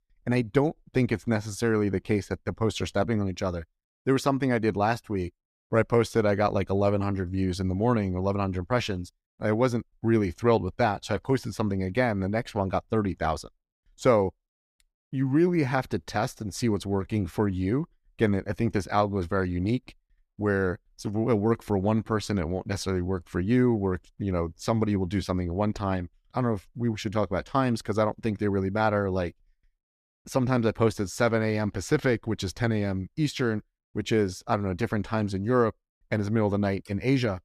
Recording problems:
none

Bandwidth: 14.5 kHz